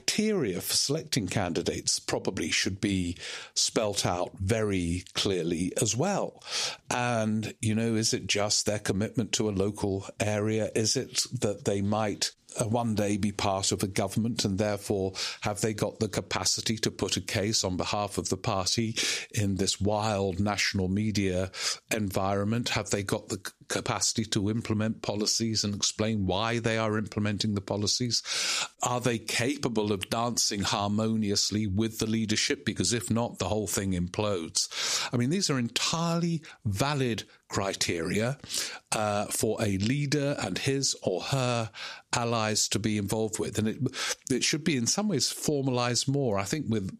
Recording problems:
squashed, flat; heavily

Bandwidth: 14.5 kHz